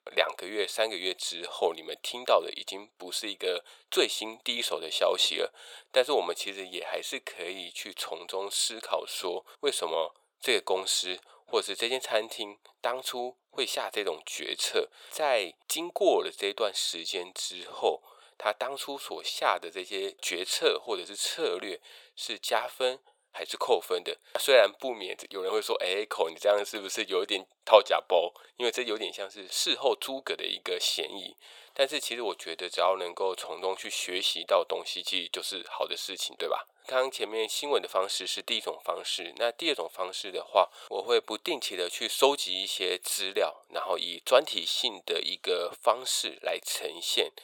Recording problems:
thin; very; fading below 450 Hz

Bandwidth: 18 kHz